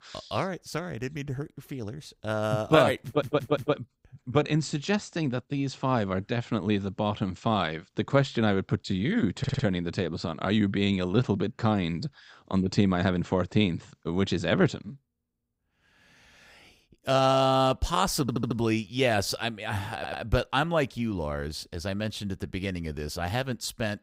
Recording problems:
audio stuttering; 4 times, first at 3 s

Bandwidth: 15.5 kHz